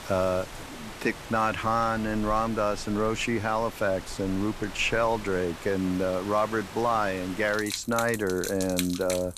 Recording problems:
rain or running water; noticeable; throughout; 10 dB below the speech

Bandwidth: 14.5 kHz